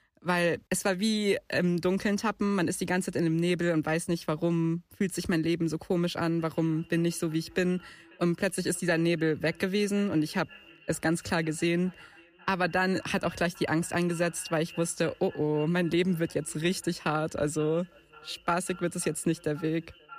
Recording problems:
echo of what is said; faint; from 6.5 s on; 530 ms later, 25 dB below the speech

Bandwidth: 14.5 kHz